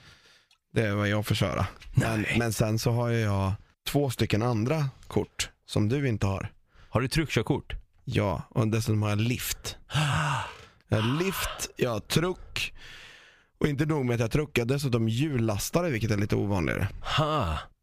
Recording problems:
squashed, flat; somewhat

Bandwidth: 15 kHz